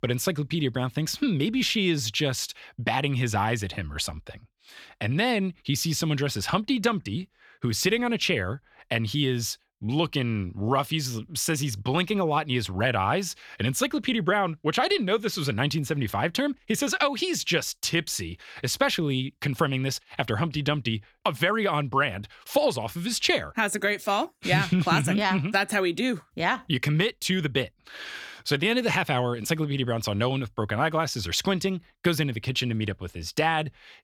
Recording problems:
none

